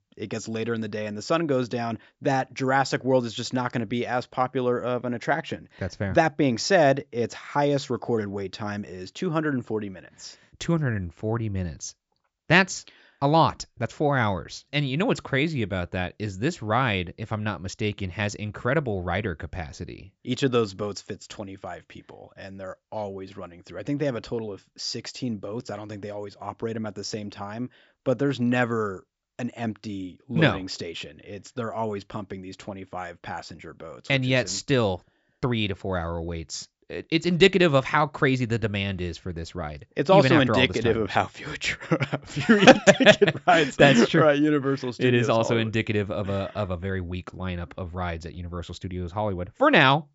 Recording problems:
high frequencies cut off; noticeable; nothing above 8 kHz

